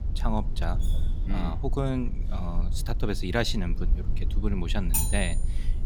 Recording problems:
low rumble; noticeable; throughout; 15 dB below the speech
clattering dishes; faint; at 1 s; peak 15 dB below the speech
clattering dishes; loud; at 5 s; peak 4 dB above the speech

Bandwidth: 18.5 kHz